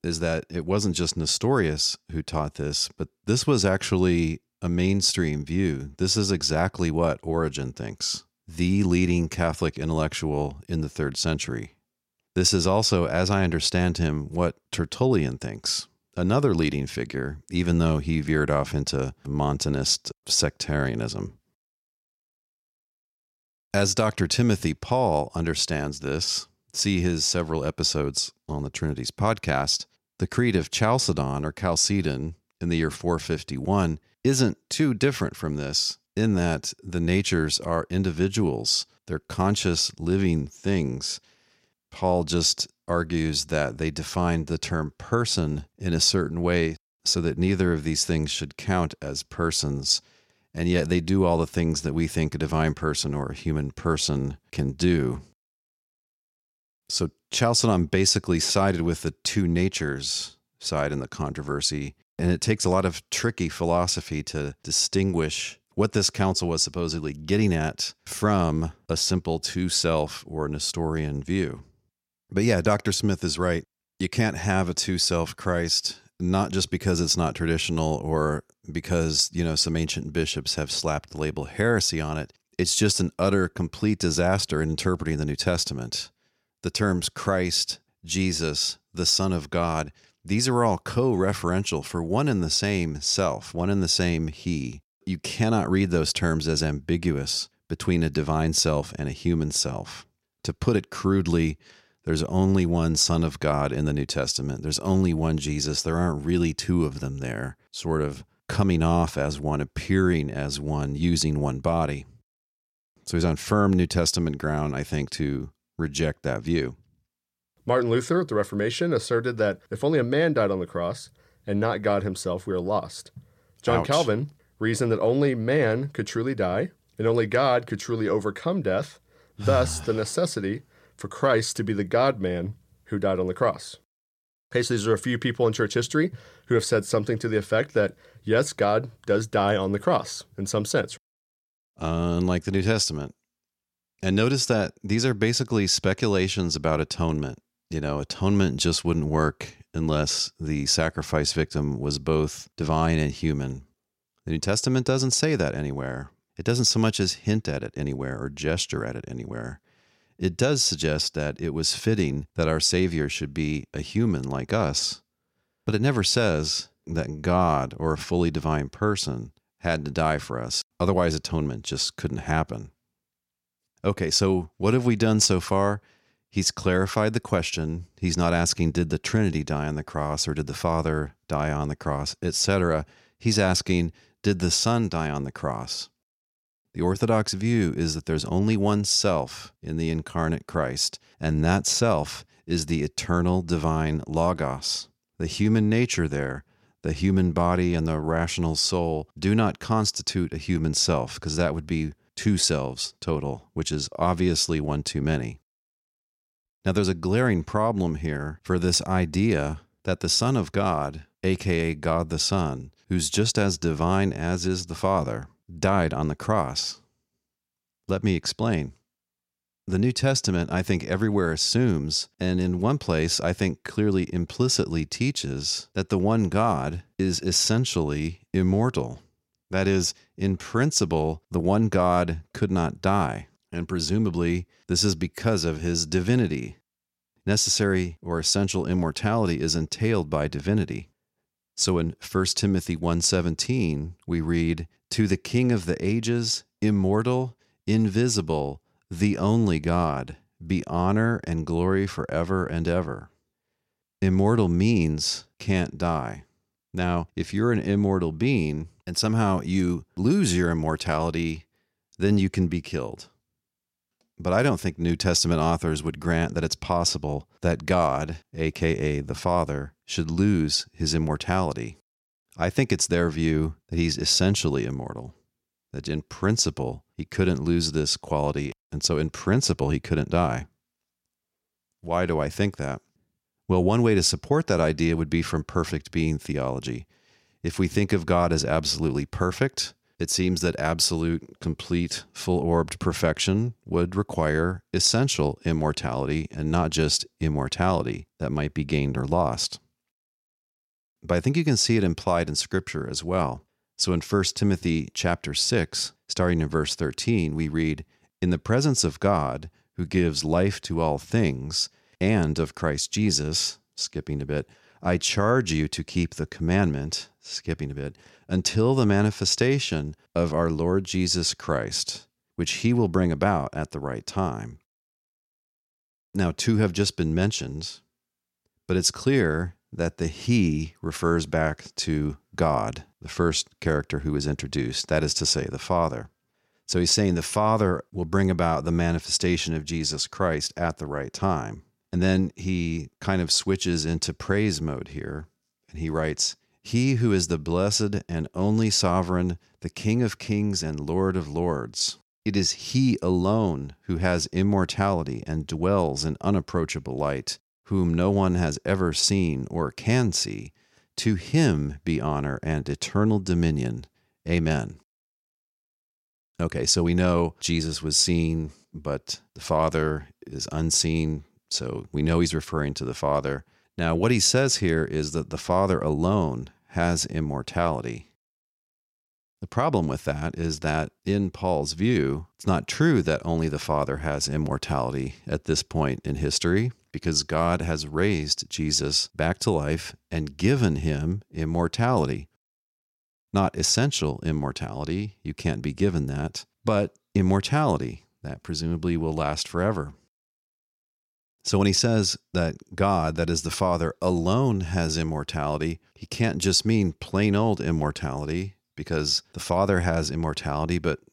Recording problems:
none

